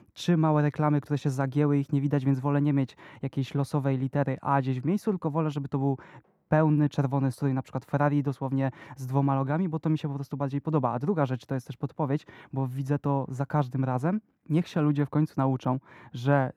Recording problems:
muffled; very; fading above 2 kHz

